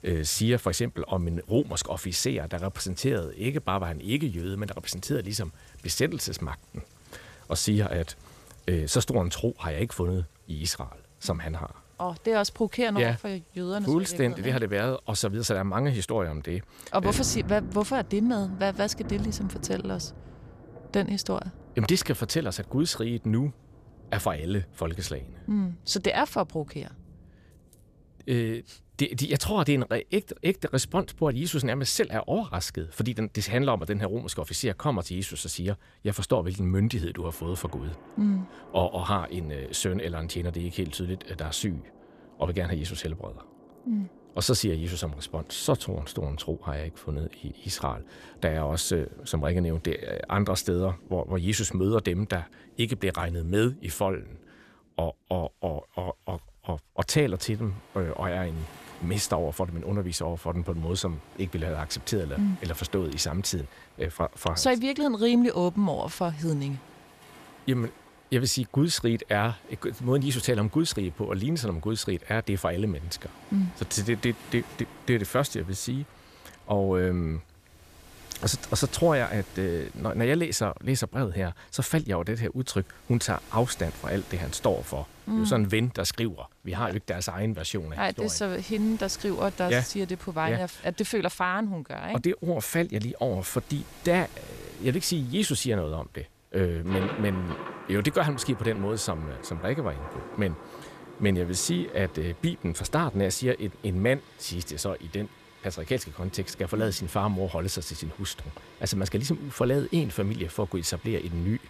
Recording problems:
rain or running water; noticeable; throughout; 20 dB below the speech

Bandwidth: 14.5 kHz